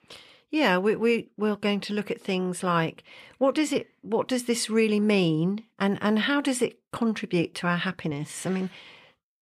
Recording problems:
none

